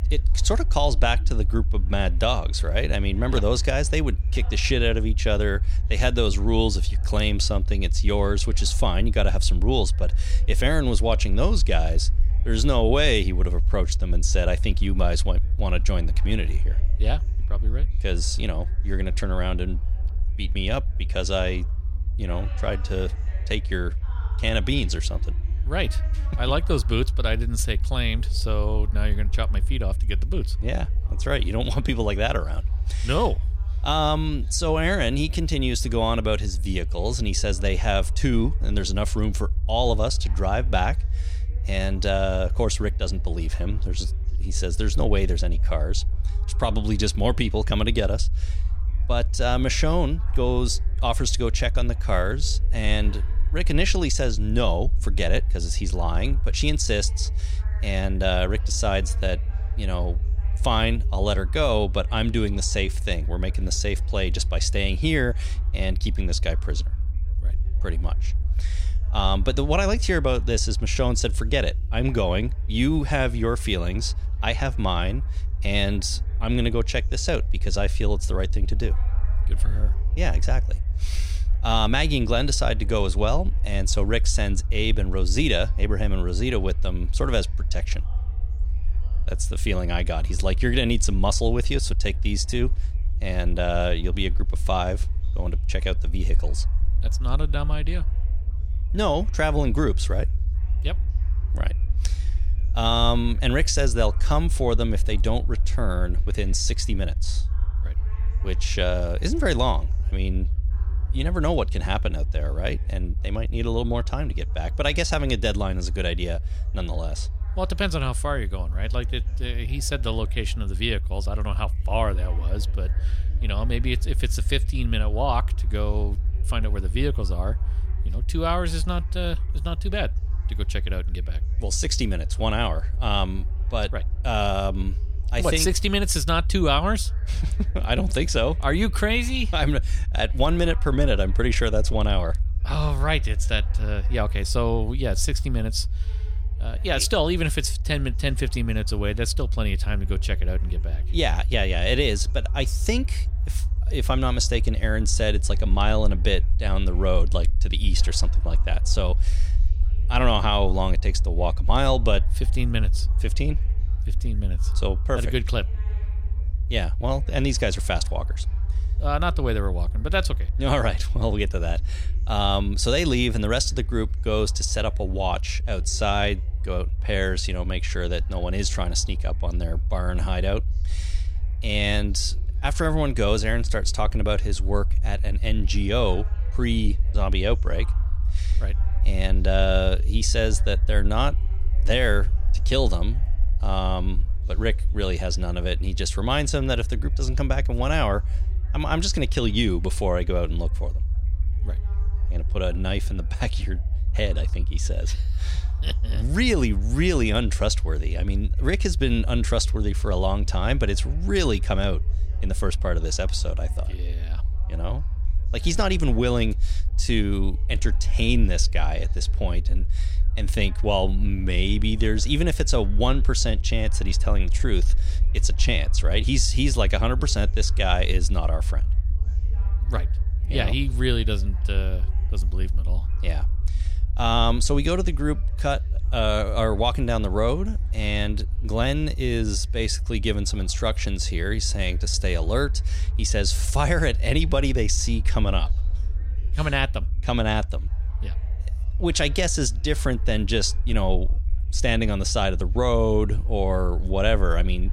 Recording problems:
chatter from many people; faint; throughout; 30 dB below the speech
low rumble; faint; throughout; 20 dB below the speech

